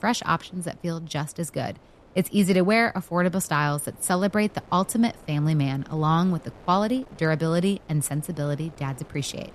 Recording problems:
wind noise on the microphone; occasional gusts; 25 dB below the speech

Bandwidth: 13.5 kHz